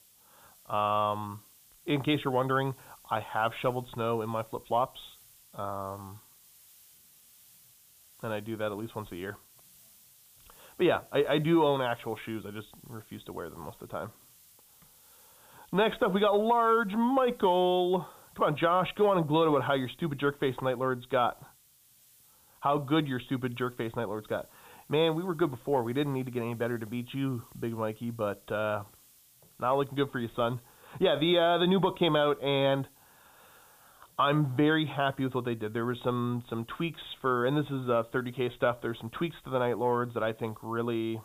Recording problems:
high frequencies cut off; severe; nothing above 4 kHz
hiss; faint; throughout; 25 dB below the speech

